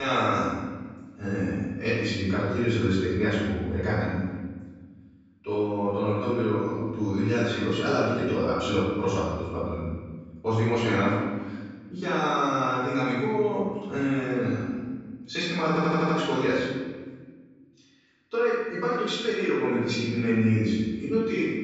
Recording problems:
room echo; strong; dies away in 1.4 s
off-mic speech; far
high frequencies cut off; noticeable; nothing above 8 kHz
abrupt cut into speech; at the start
audio stuttering; at 16 s

